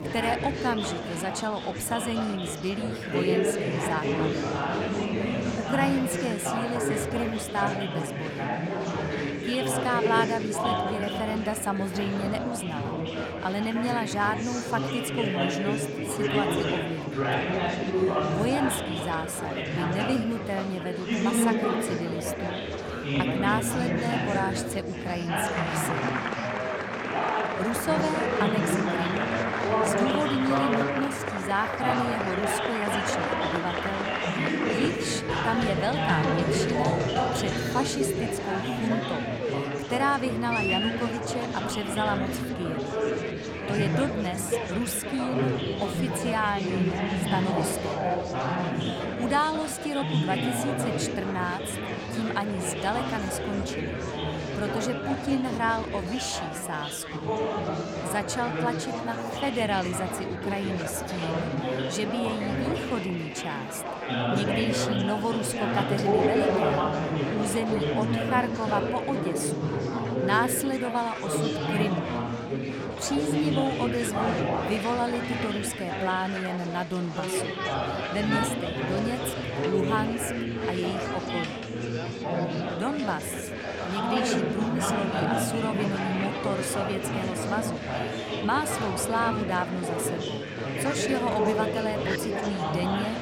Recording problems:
chatter from many people; very loud; throughout; 2 dB above the speech

